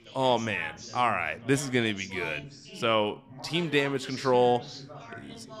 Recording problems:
background chatter; noticeable; throughout; 3 voices, 15 dB below the speech

